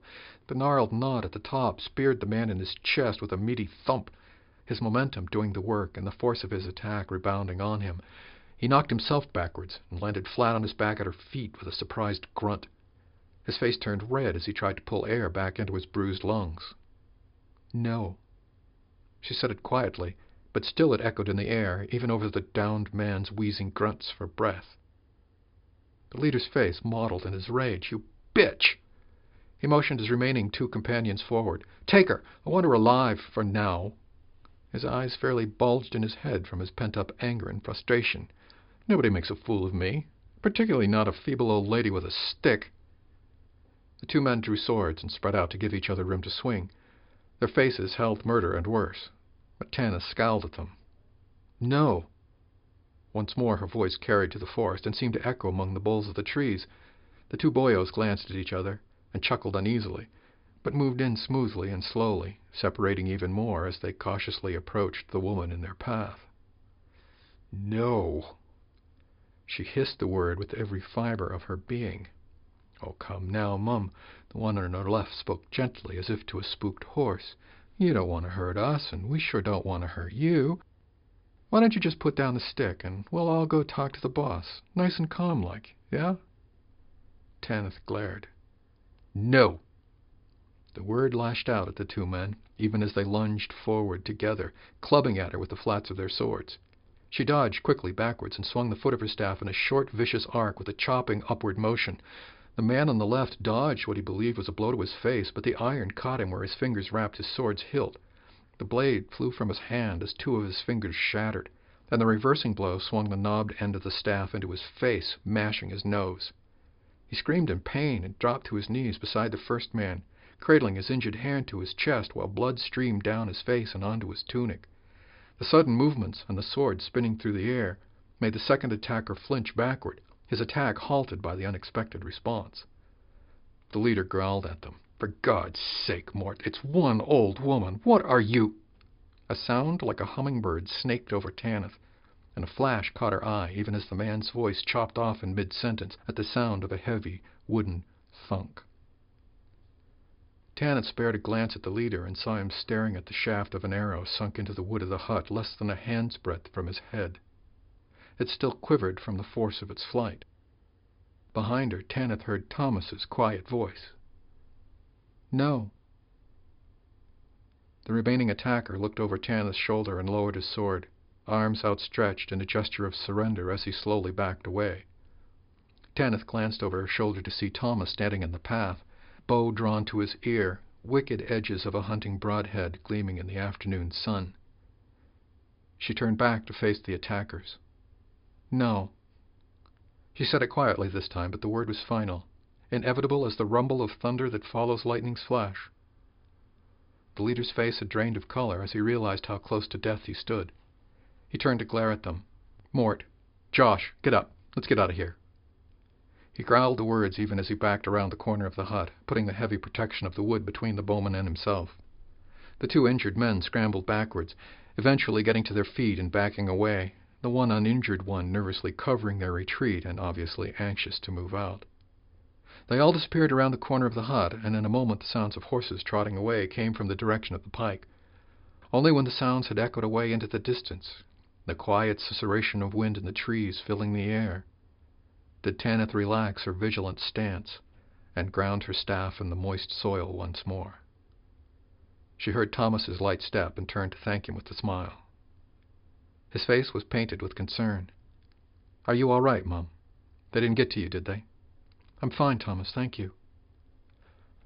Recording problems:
high frequencies cut off; noticeable; nothing above 5 kHz

